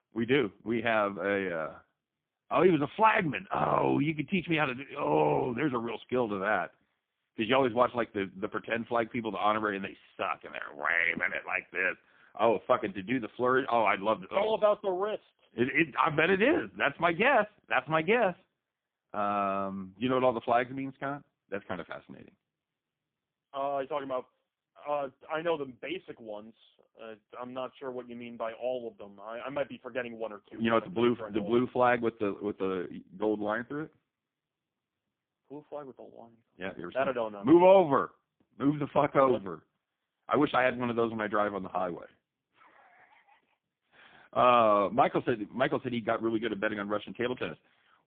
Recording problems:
phone-call audio; poor line

